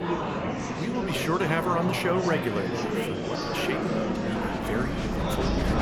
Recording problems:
murmuring crowd; very loud; throughout; 1 dB above the speech

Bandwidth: 18.5 kHz